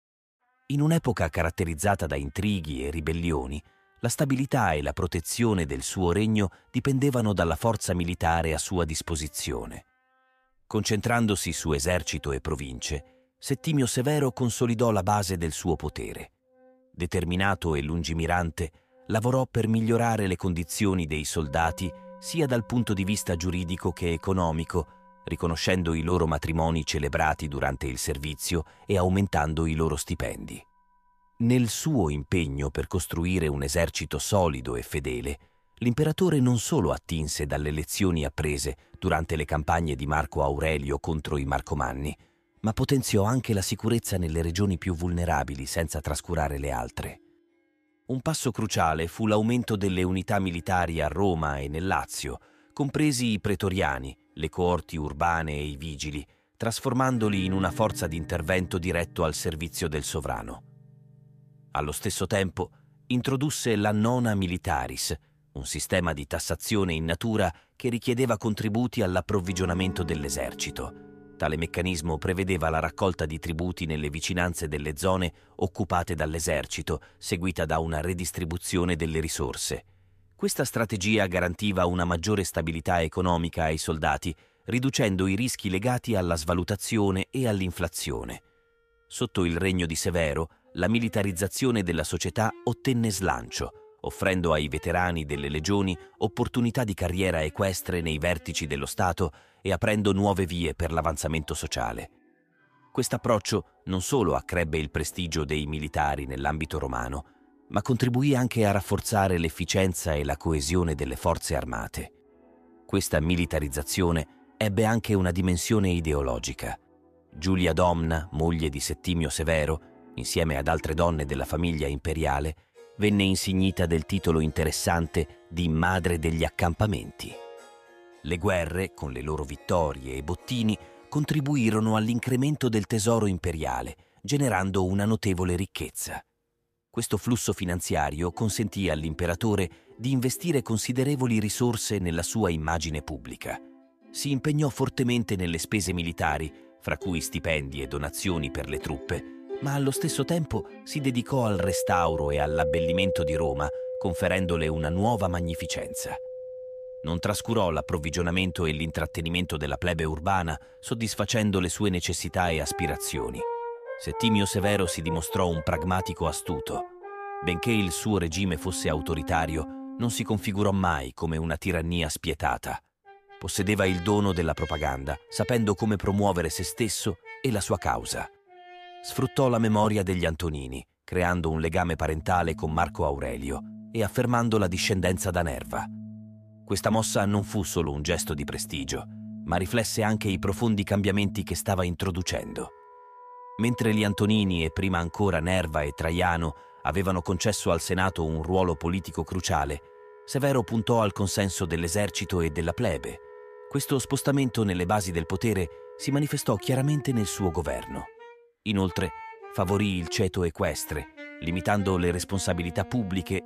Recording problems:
background music; noticeable; throughout; 15 dB below the speech

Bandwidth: 14.5 kHz